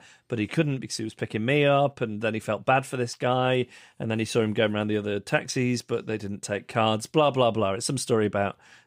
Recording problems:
none

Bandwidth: 15.5 kHz